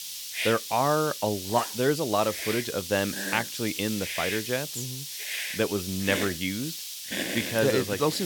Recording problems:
hiss; loud; throughout; 4 dB below the speech
abrupt cut into speech; at the end

